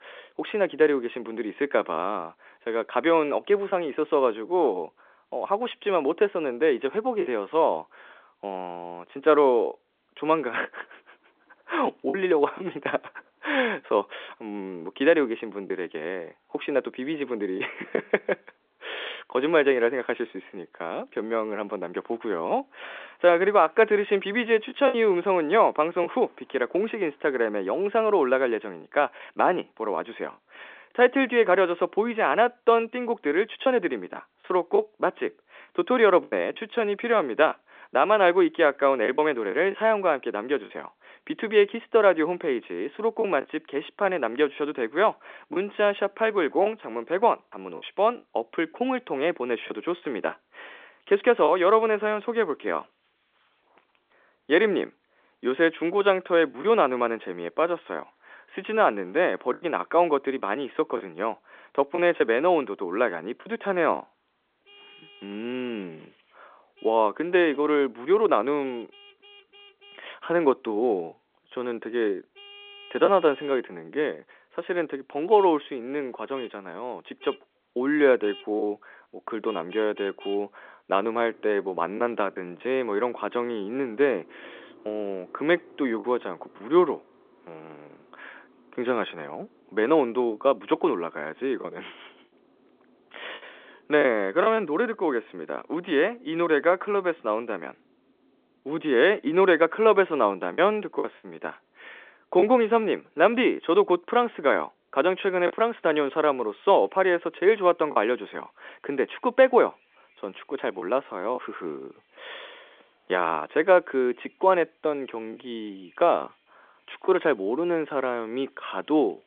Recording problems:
phone-call audio; nothing above 3.5 kHz
traffic noise; faint; throughout; 30 dB below the speech
choppy; occasionally; 2% of the speech affected

